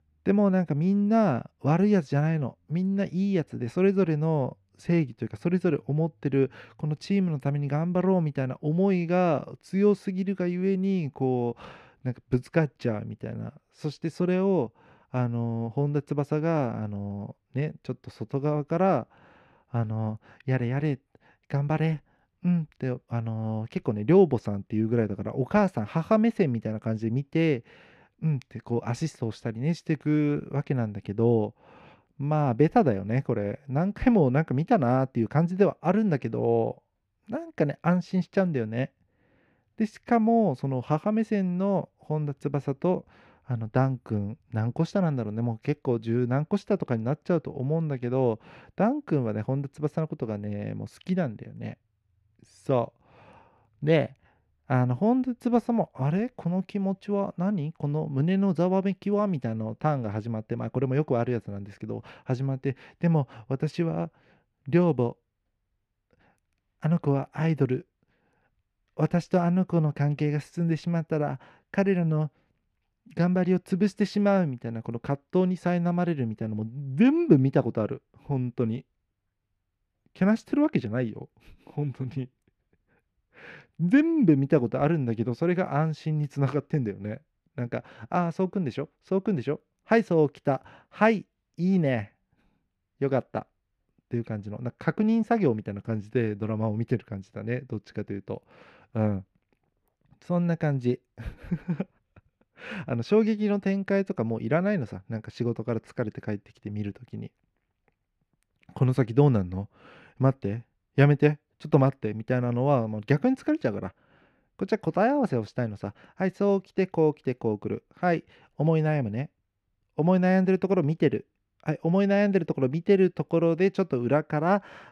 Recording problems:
muffled; slightly; fading above 4 kHz

